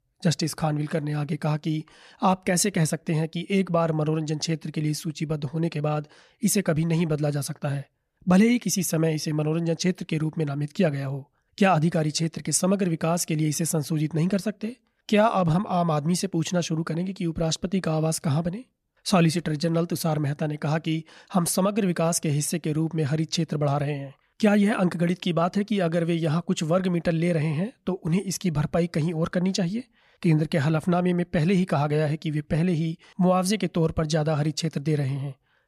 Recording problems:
none

